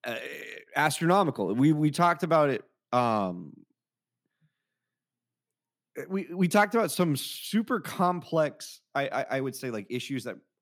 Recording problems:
none

